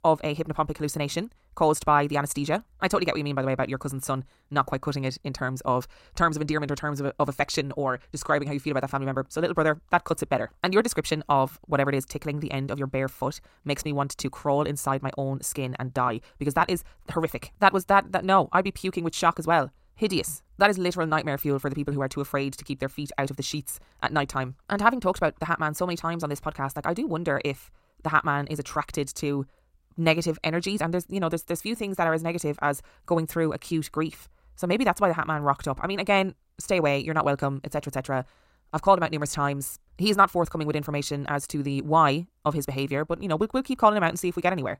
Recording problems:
wrong speed, natural pitch; too fast; 1.5 times normal speed

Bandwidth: 16 kHz